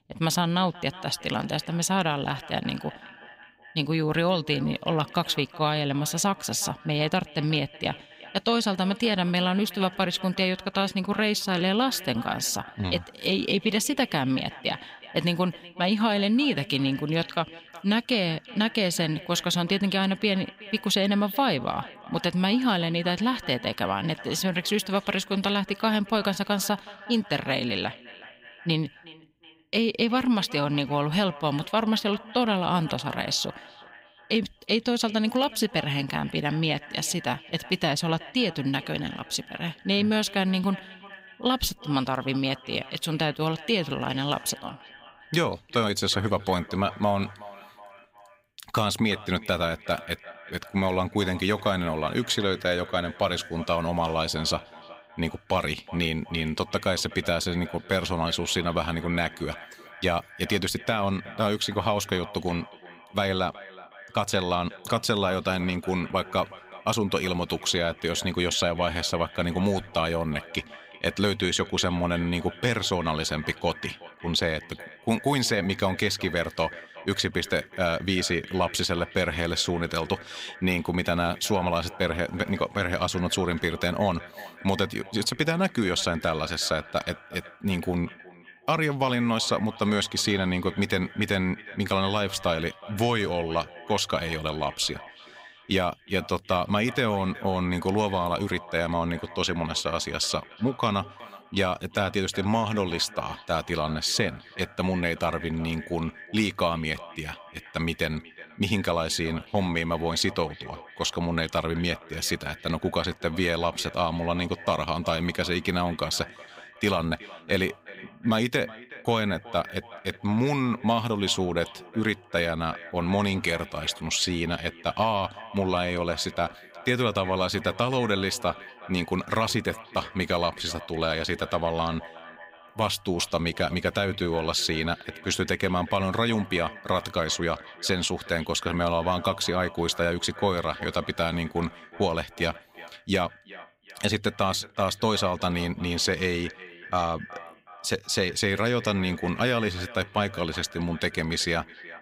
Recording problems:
echo of what is said; noticeable; throughout; 370 ms later, 20 dB below the speech

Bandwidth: 15.5 kHz